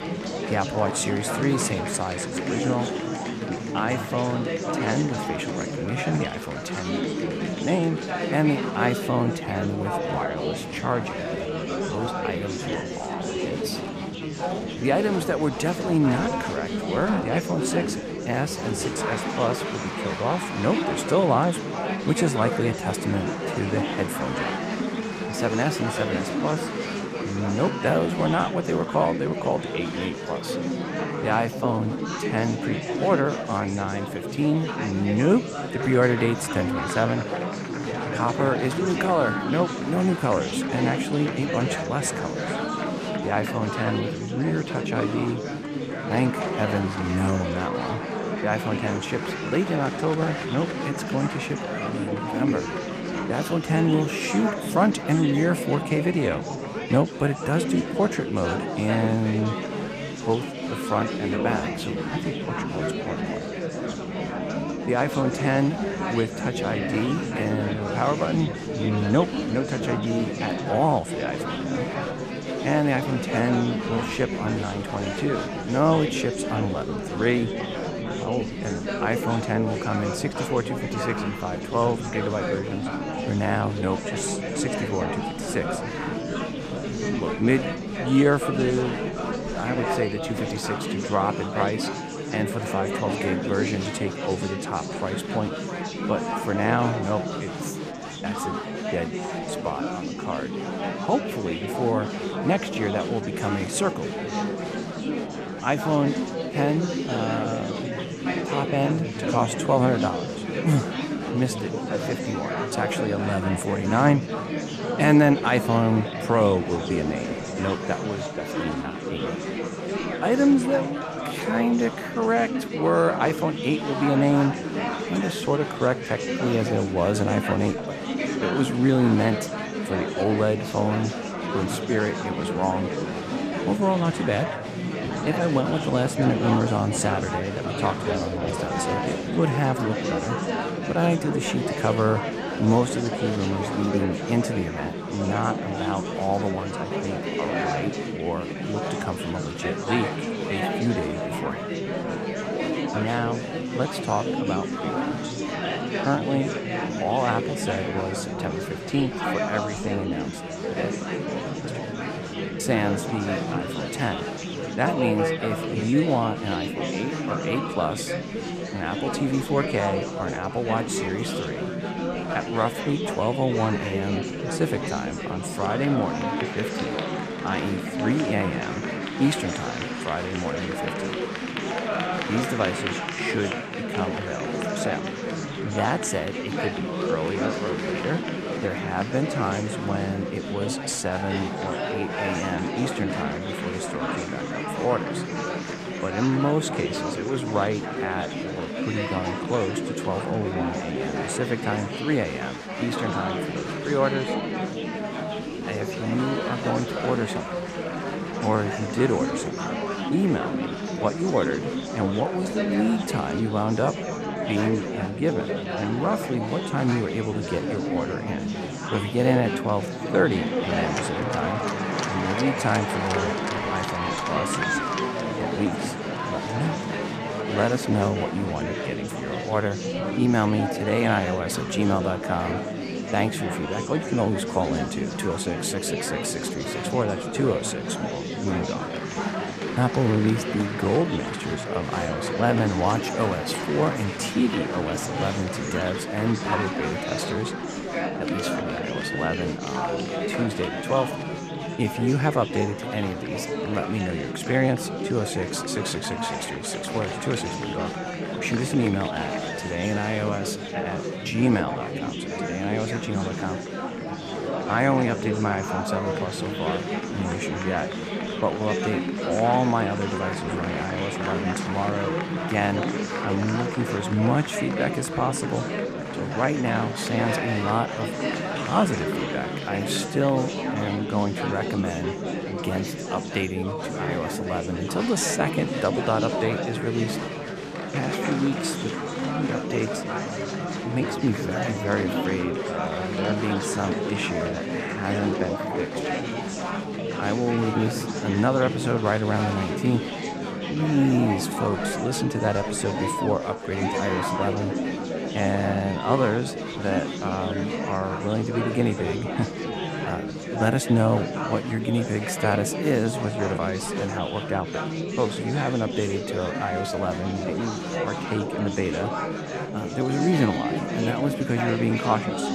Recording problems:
chatter from many people; loud; throughout; 2 dB below the speech

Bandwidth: 14.5 kHz